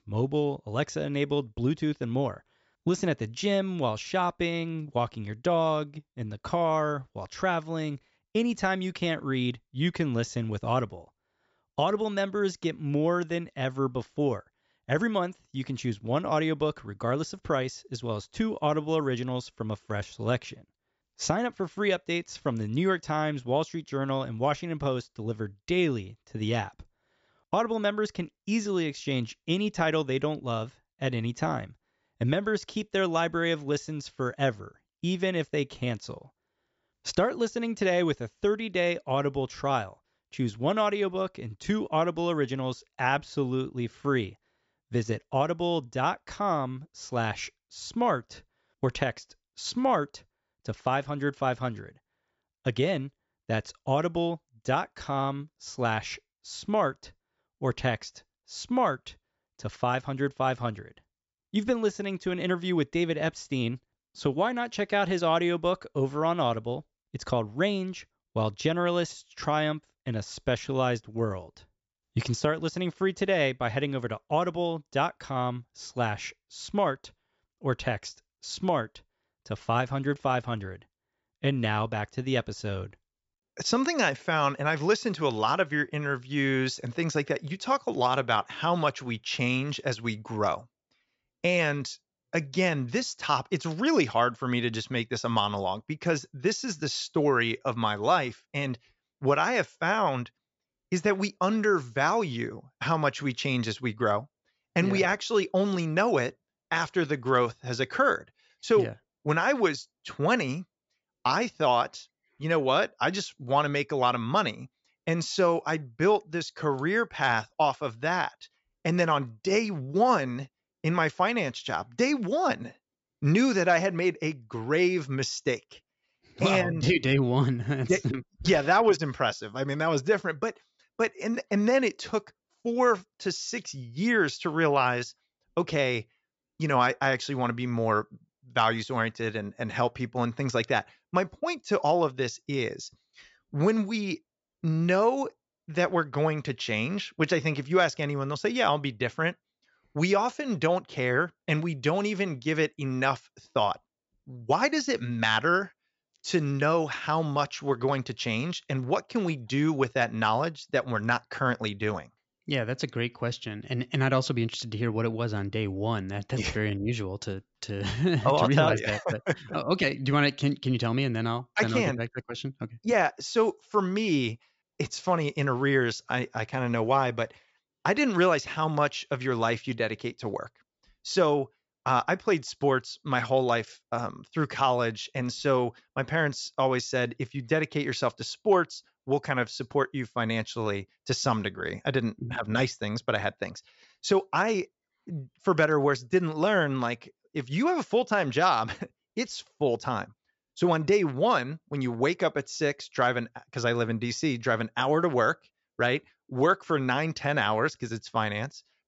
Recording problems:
high frequencies cut off; noticeable; nothing above 8 kHz

